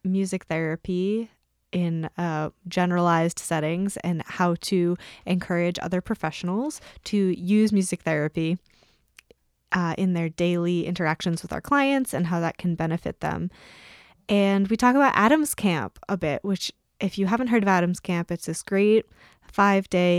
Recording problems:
abrupt cut into speech; at the end

